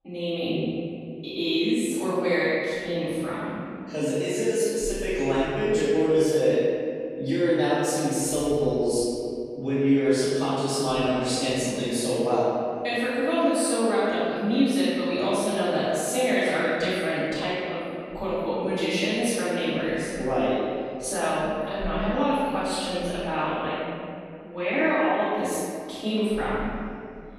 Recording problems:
room echo; strong; dies away in 2.3 s
off-mic speech; far

